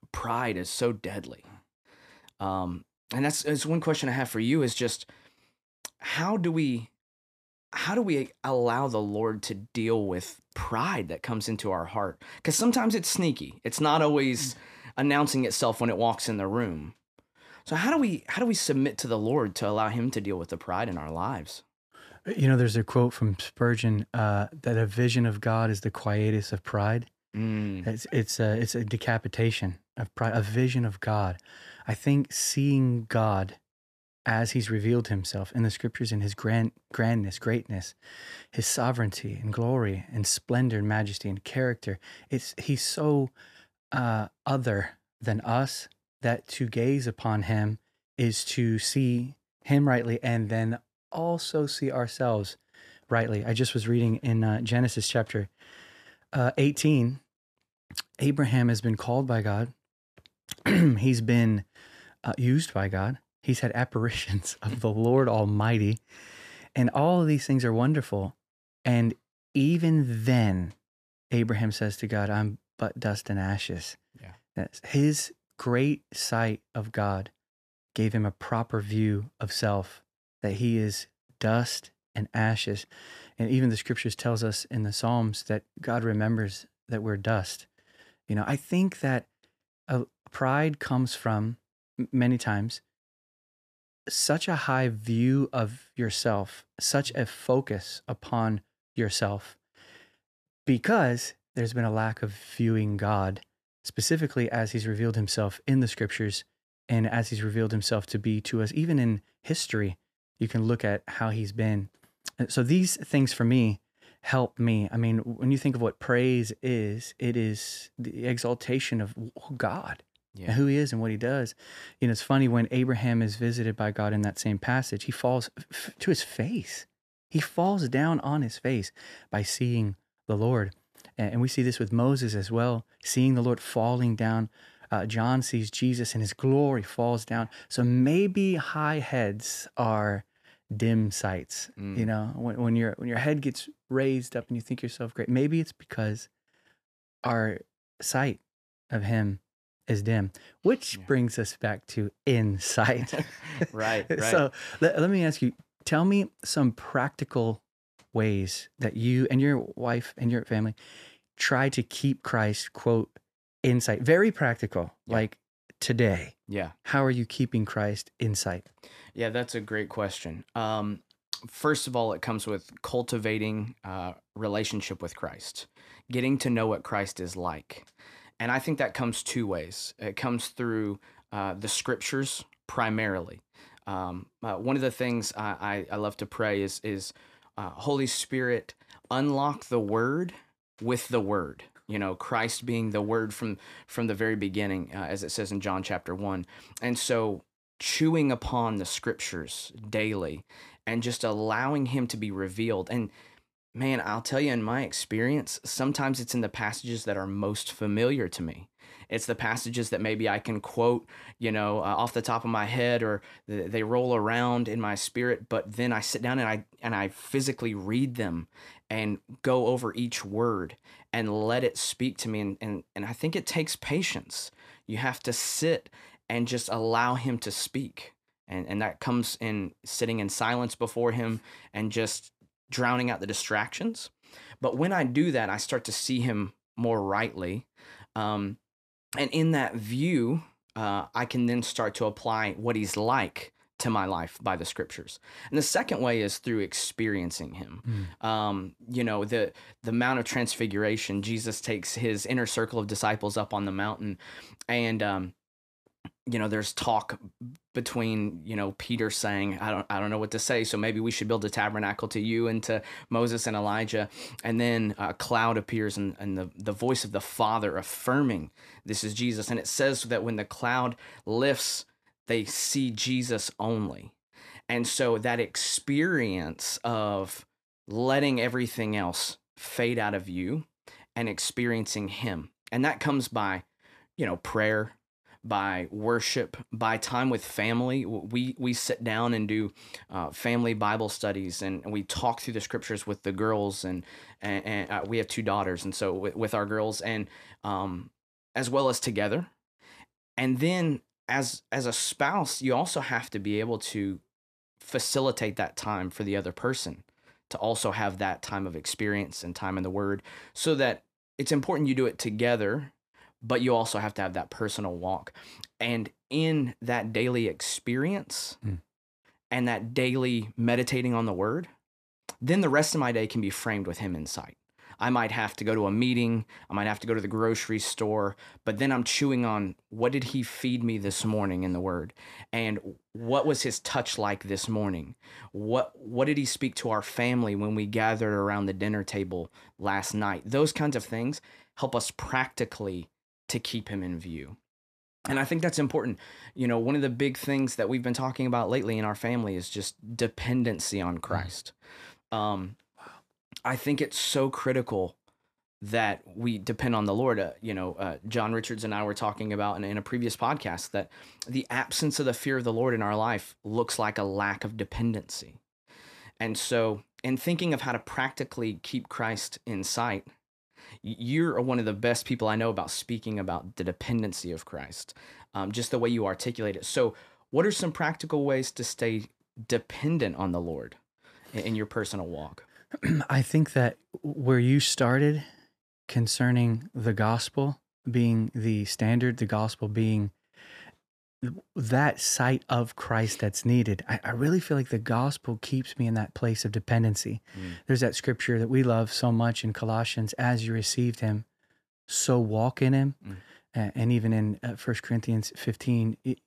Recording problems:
none

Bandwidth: 14.5 kHz